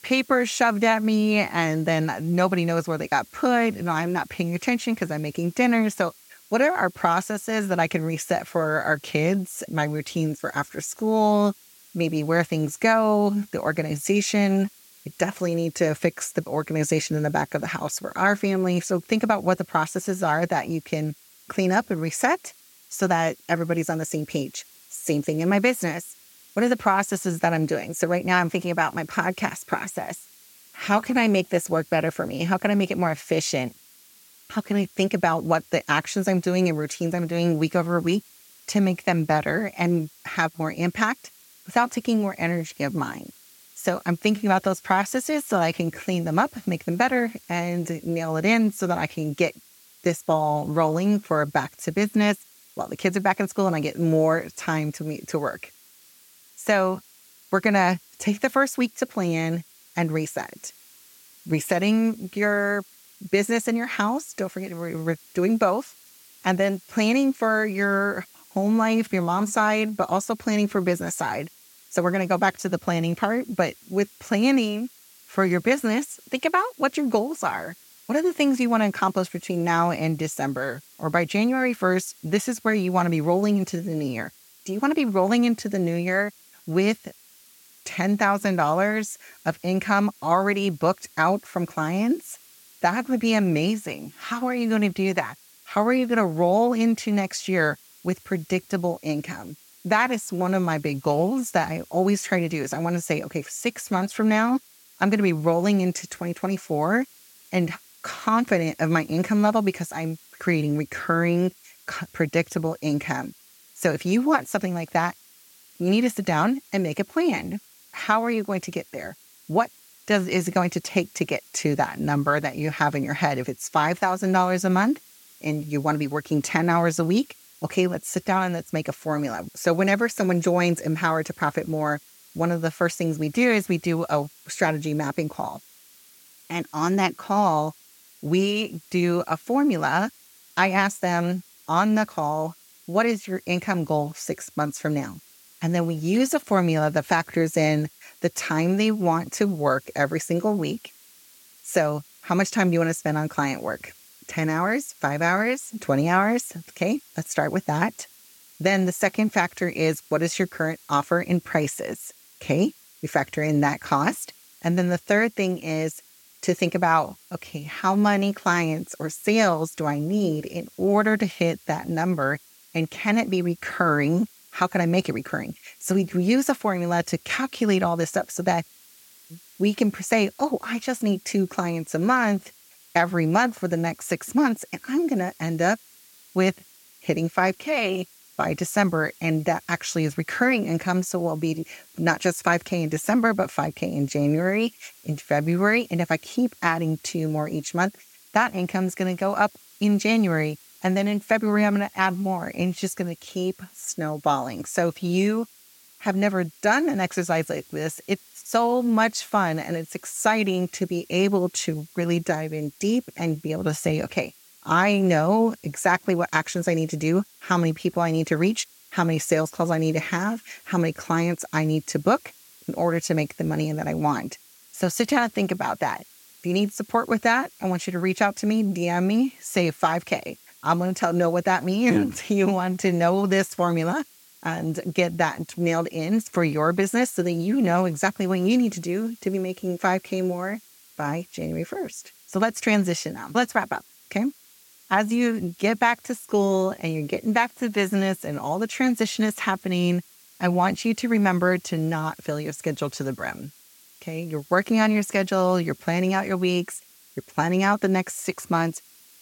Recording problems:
hiss; faint; throughout; 25 dB below the speech

